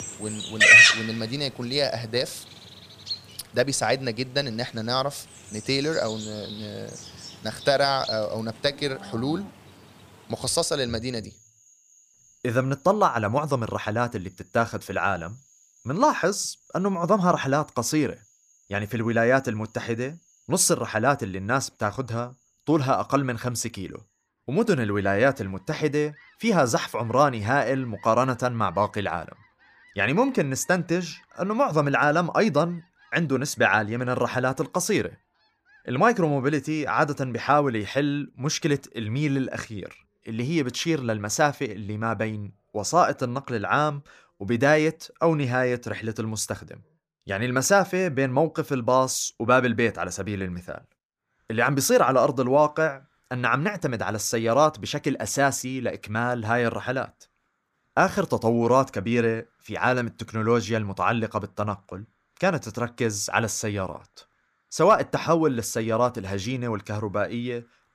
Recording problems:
animal sounds; very loud; throughout; 3 dB above the speech

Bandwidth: 15 kHz